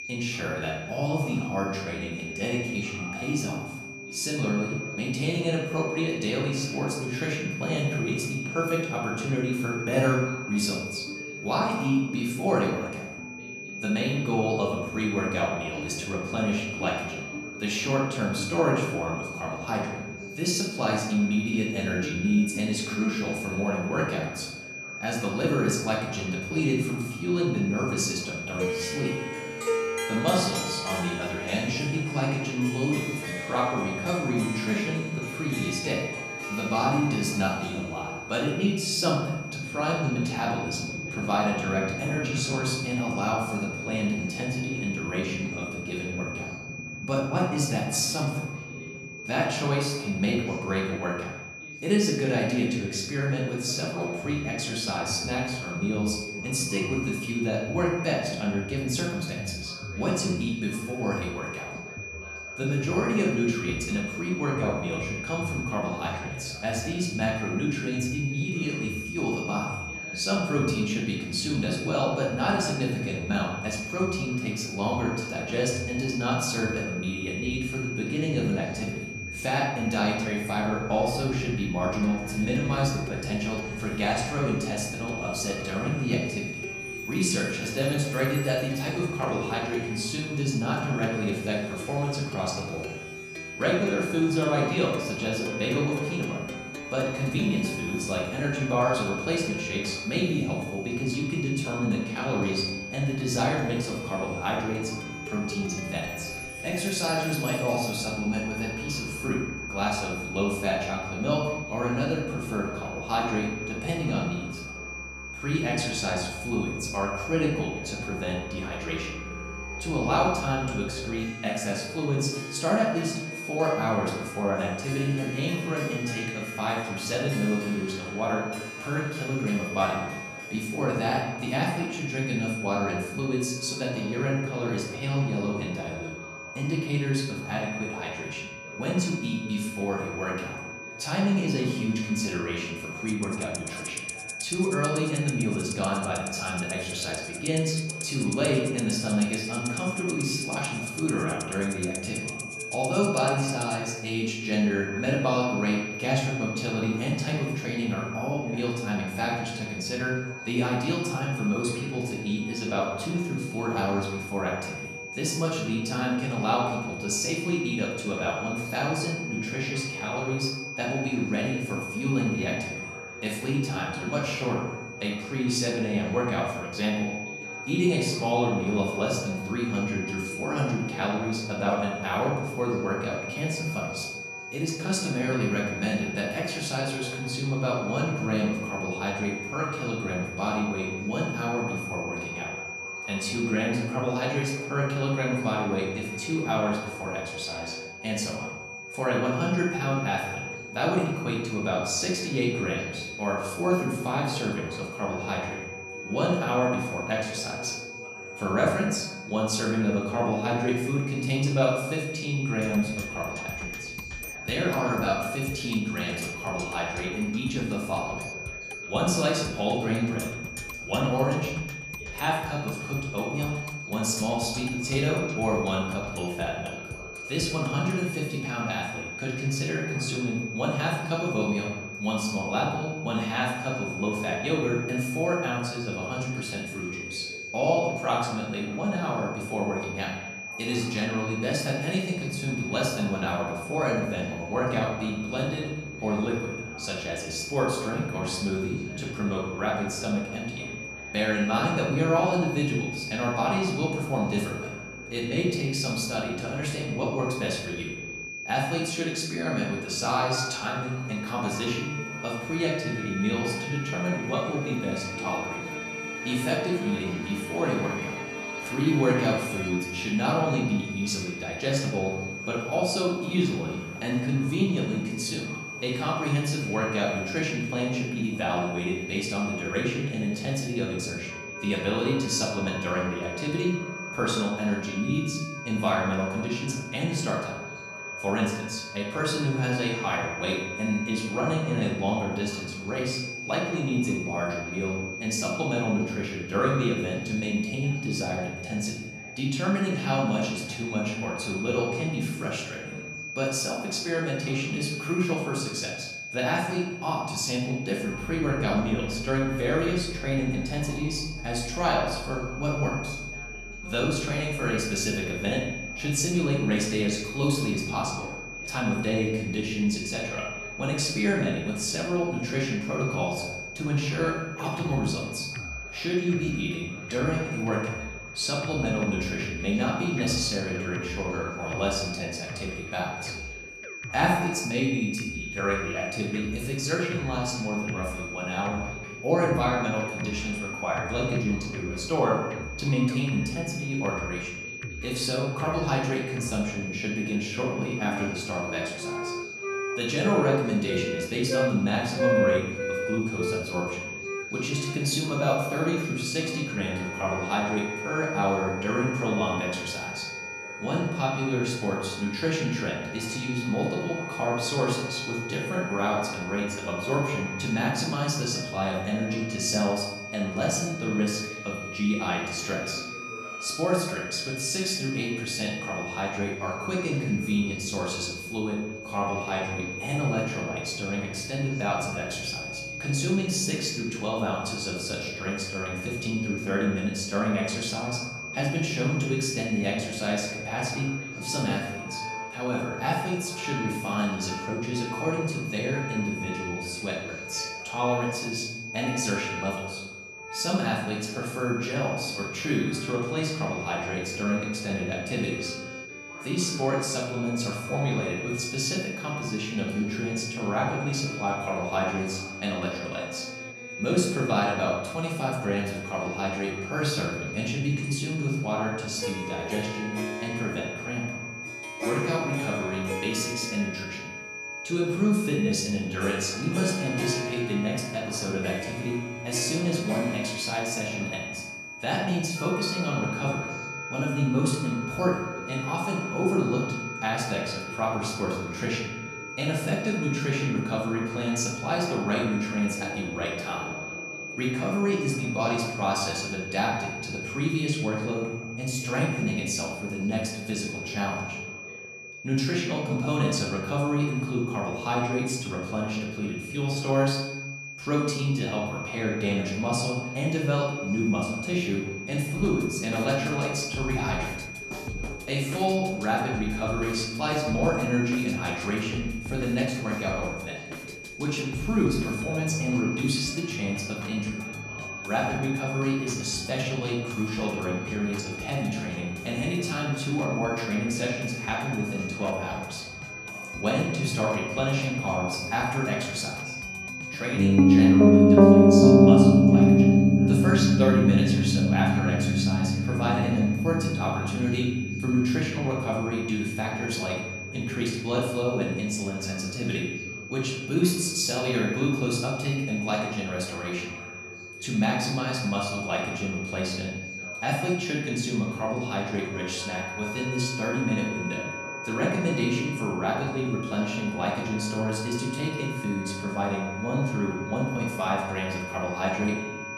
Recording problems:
off-mic speech; far
room echo; noticeable; dies away in 0.9 s
high-pitched whine; loud; throughout; 2.5 kHz, 8 dB below the speech
background music; loud; throughout; 4 dB below the speech
voice in the background; noticeable; throughout; 20 dB below the speech

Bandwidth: 14 kHz